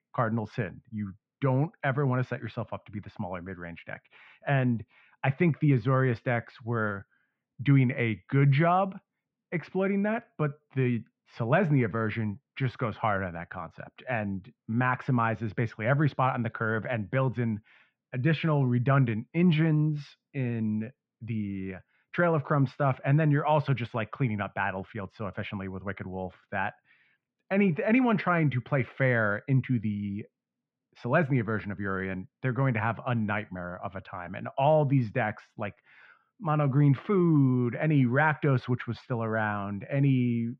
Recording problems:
muffled; very; fading above 2.5 kHz

